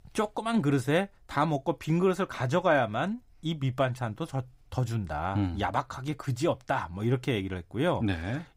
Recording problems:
none

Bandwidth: 15.5 kHz